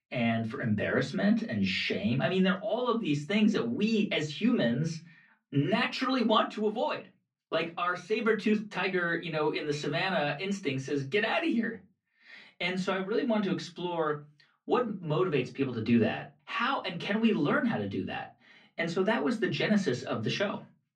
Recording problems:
off-mic speech; far
room echo; very slight; dies away in 0.2 s
muffled; very slightly; fading above 3.5 kHz

